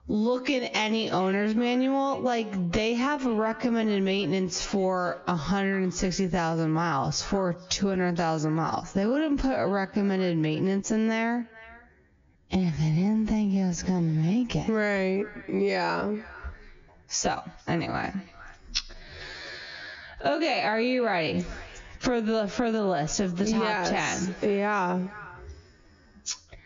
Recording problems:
squashed, flat; heavily
wrong speed, natural pitch; too slow; 0.6 times normal speed
high frequencies cut off; noticeable; nothing above 7 kHz
echo of what is said; faint; throughout; 450 ms later, 20 dB below the speech

